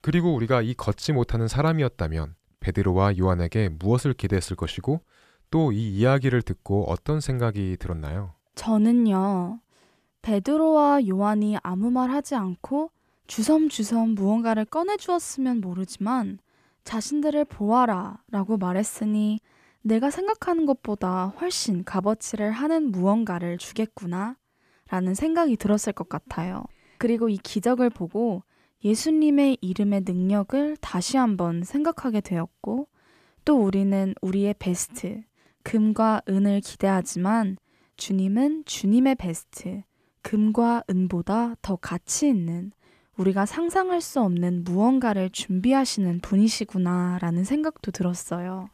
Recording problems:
none

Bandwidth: 14.5 kHz